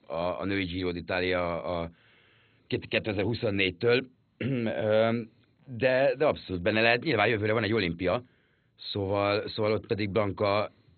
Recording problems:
garbled, watery; badly; nothing above 4 kHz

